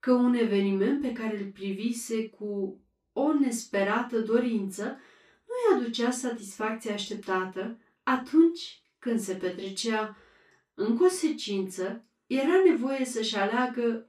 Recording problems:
off-mic speech; far
room echo; noticeable; dies away in 0.2 s

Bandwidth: 14.5 kHz